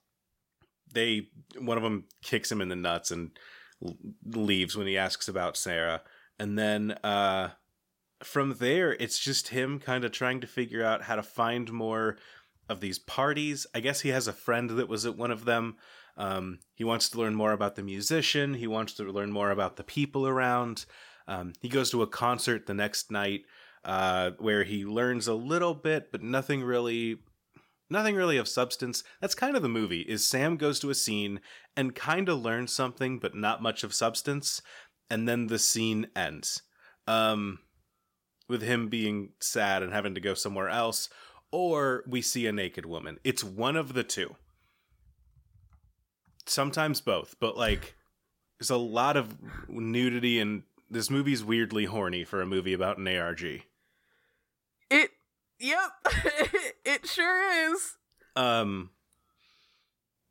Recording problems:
none

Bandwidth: 16.5 kHz